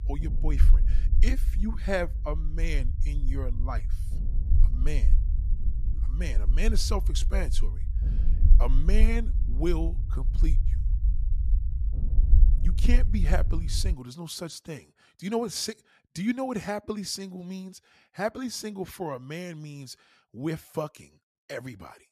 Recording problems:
low rumble; noticeable; until 14 s; 15 dB below the speech

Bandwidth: 14.5 kHz